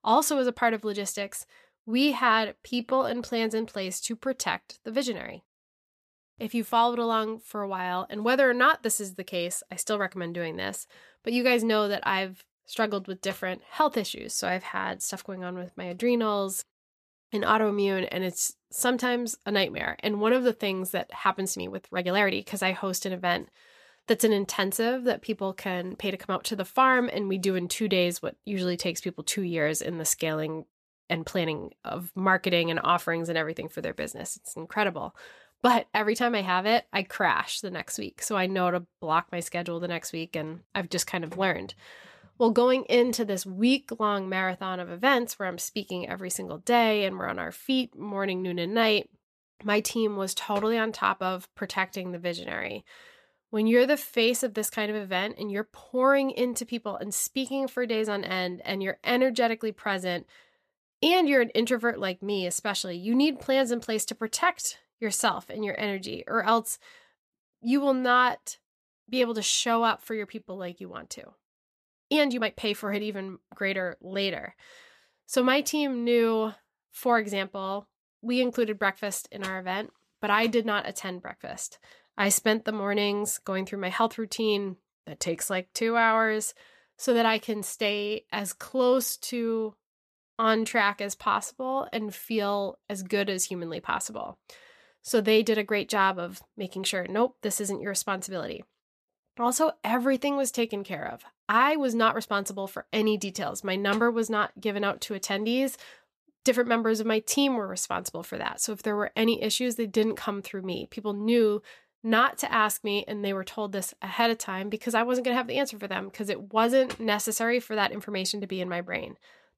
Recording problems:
uneven, jittery; strongly; from 2.5 s to 1:42

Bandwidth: 14.5 kHz